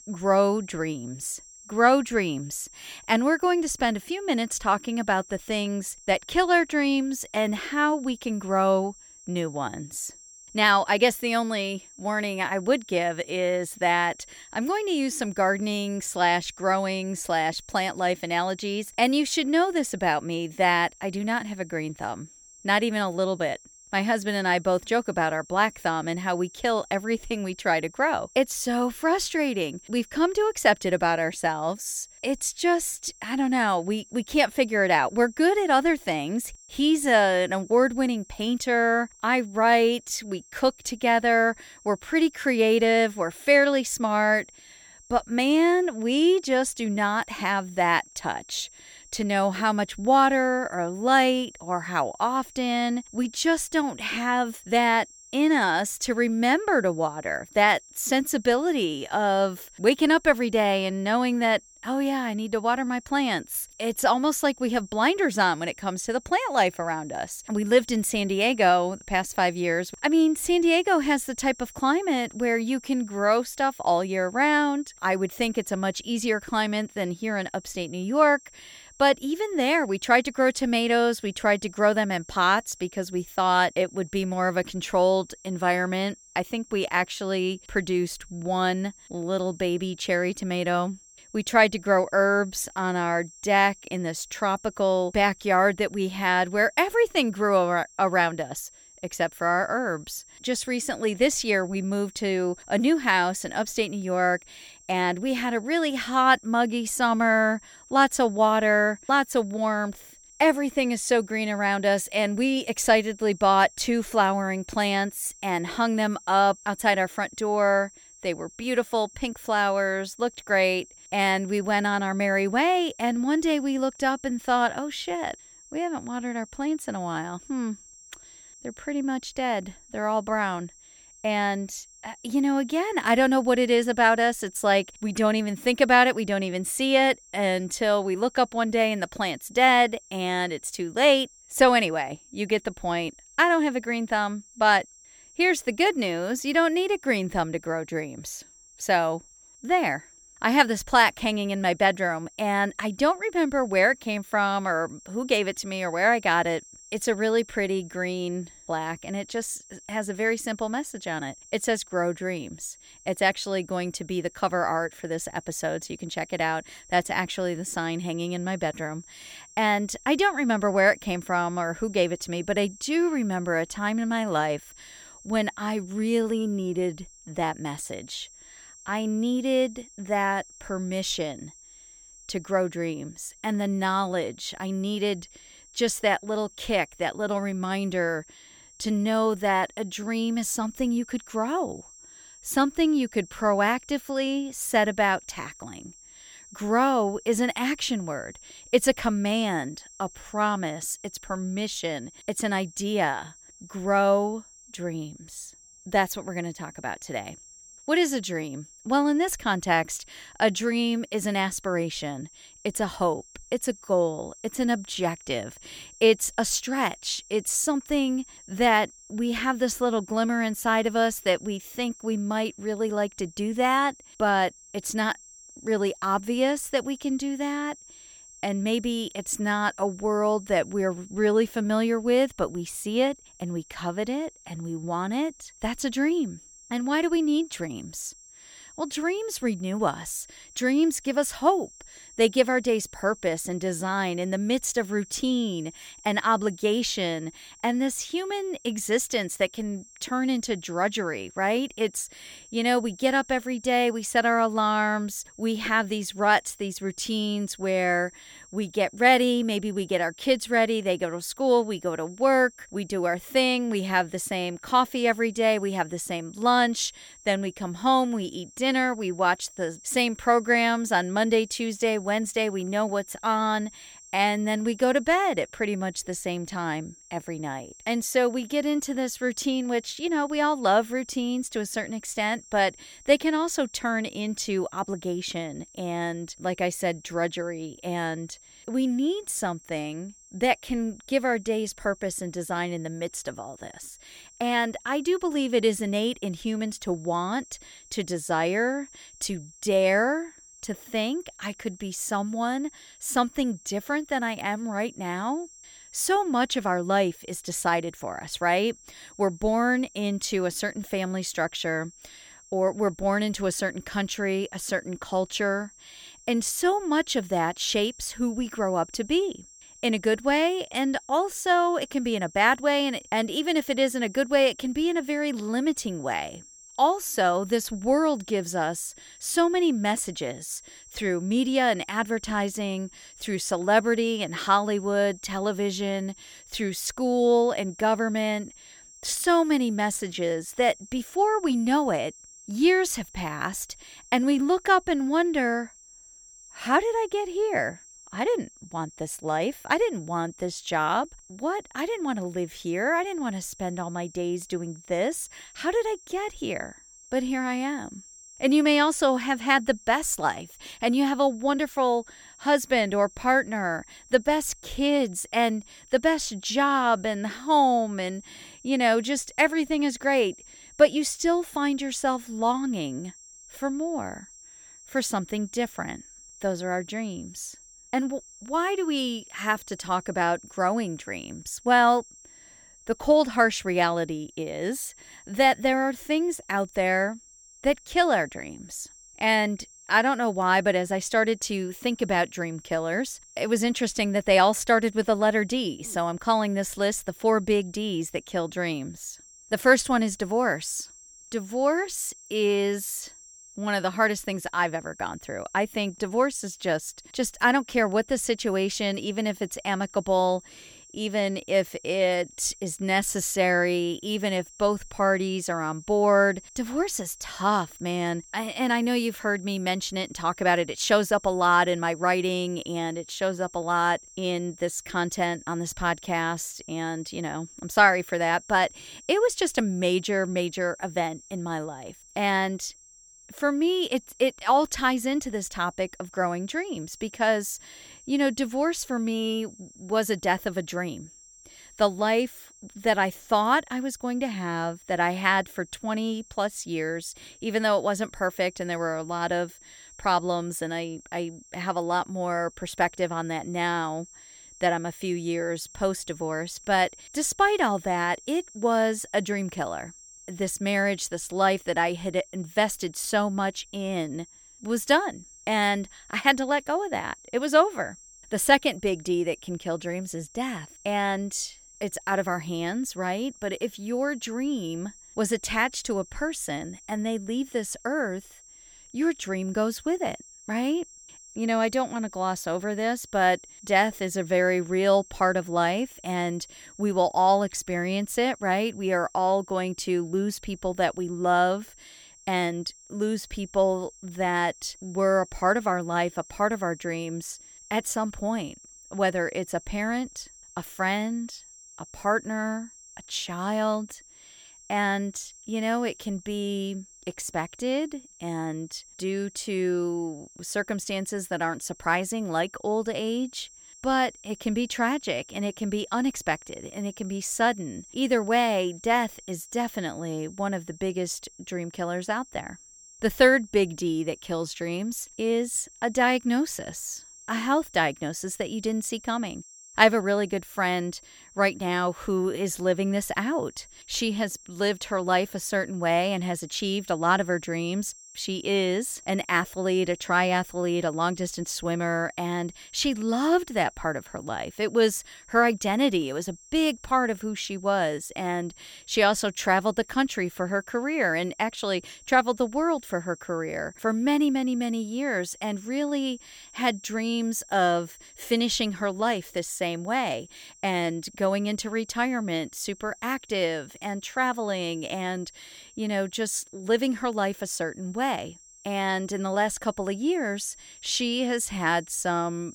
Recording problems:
high-pitched whine; faint; throughout; 7.5 kHz, 25 dB below the speech

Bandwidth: 17 kHz